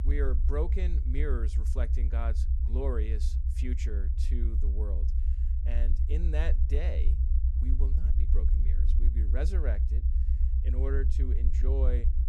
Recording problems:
low rumble; loud; throughout; 7 dB below the speech

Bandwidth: 13.5 kHz